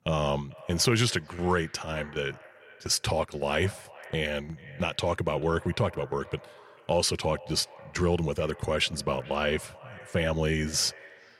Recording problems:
echo of what is said; faint; throughout; 440 ms later, 20 dB below the speech

